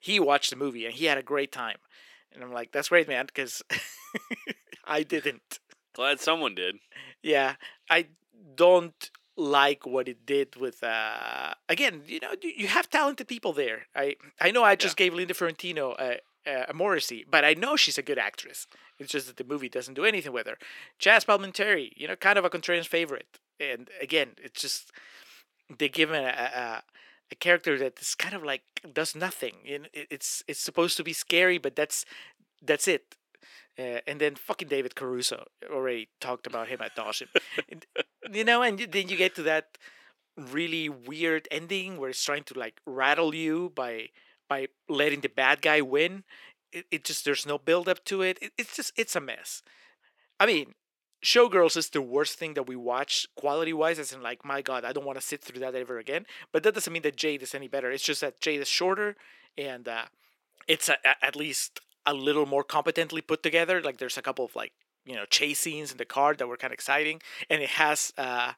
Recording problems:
thin; somewhat; fading below 350 Hz

